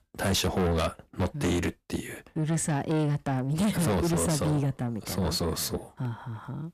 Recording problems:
distortion; heavy; 6 dB below the speech

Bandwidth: 14.5 kHz